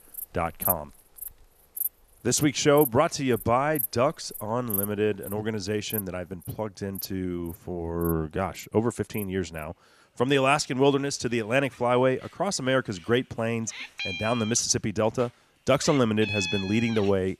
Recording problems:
animal sounds; loud; throughout; 8 dB below the speech

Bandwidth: 14.5 kHz